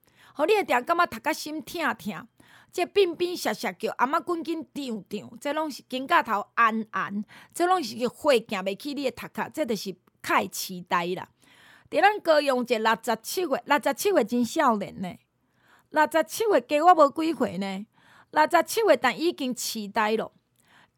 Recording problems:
none

